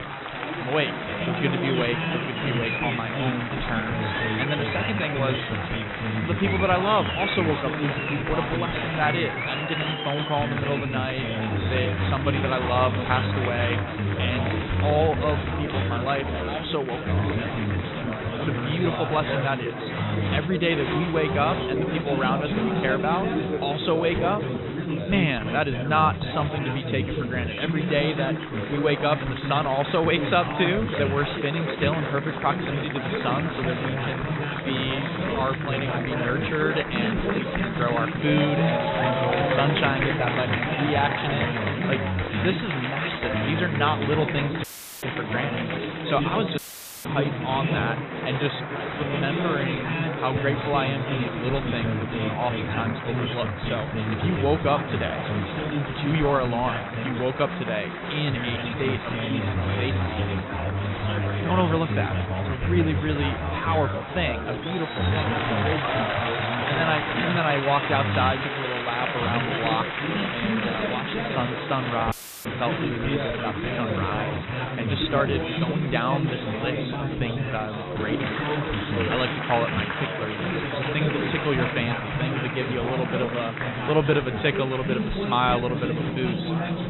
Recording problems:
high frequencies cut off; severe; nothing above 4 kHz
chatter from many people; very loud; throughout; as loud as the speech
audio cutting out; filled with static; at 45 s, at 47 s and at 1:12

